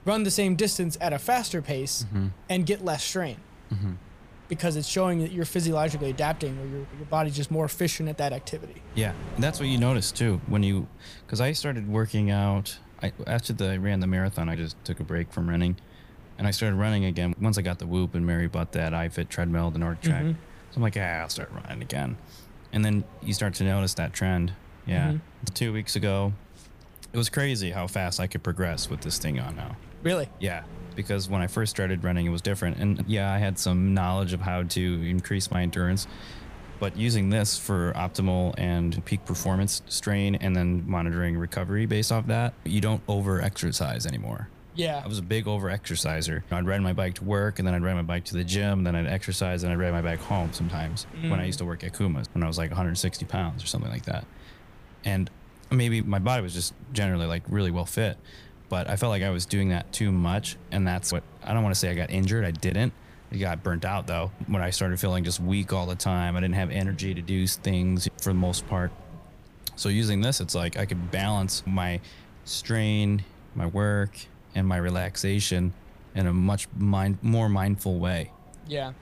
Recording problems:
wind noise on the microphone; occasional gusts; 20 dB below the speech

